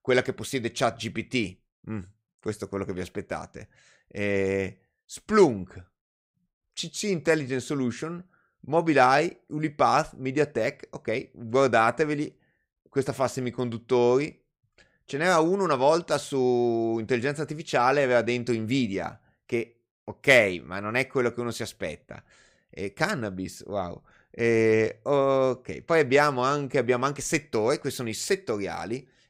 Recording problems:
none

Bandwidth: 15.5 kHz